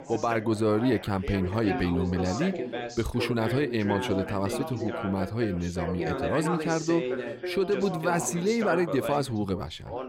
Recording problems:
background chatter; loud; throughout; 3 voices, 6 dB below the speech

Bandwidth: 16 kHz